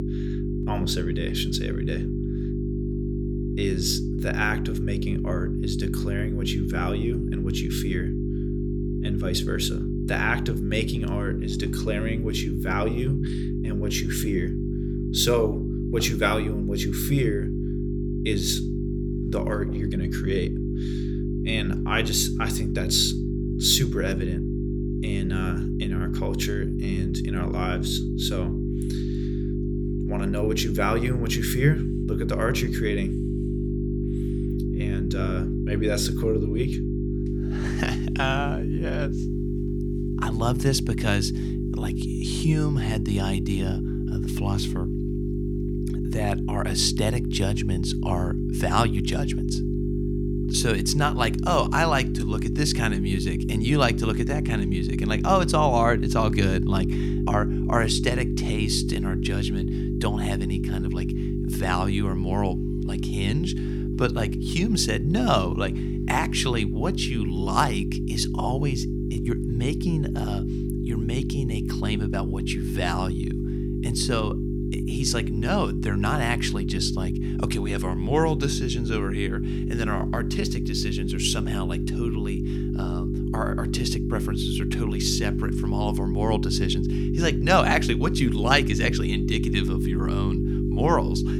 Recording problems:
electrical hum; loud; throughout; 50 Hz, 6 dB below the speech

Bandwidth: 19 kHz